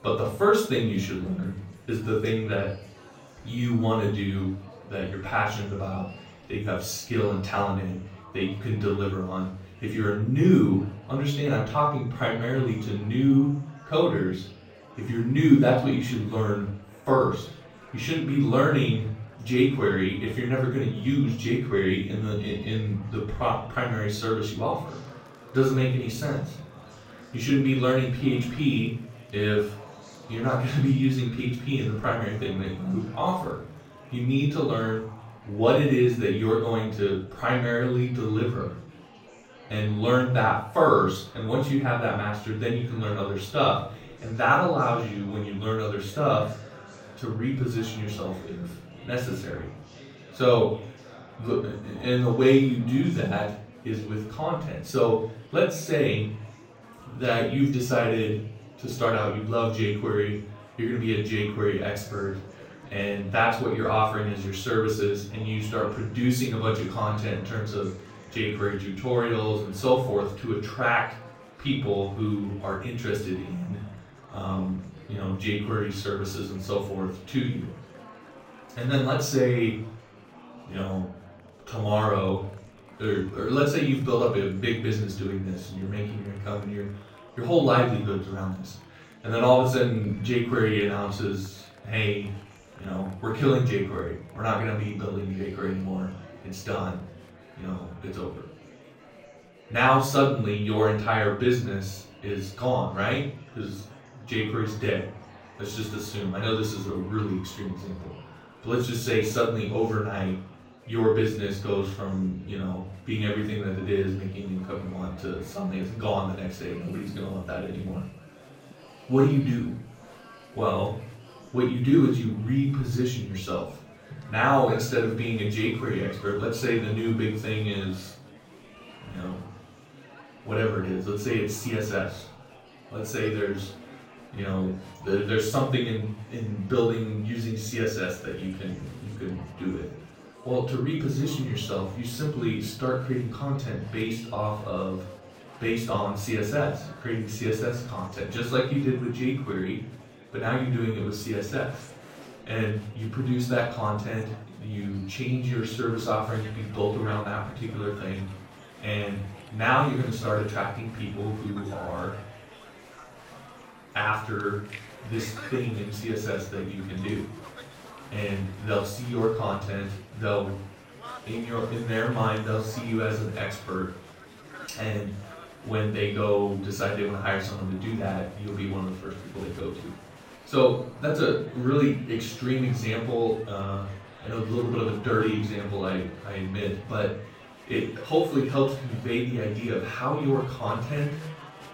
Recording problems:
off-mic speech; far
room echo; noticeable; dies away in 0.5 s
murmuring crowd; faint; throughout; 20 dB below the speech

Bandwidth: 16 kHz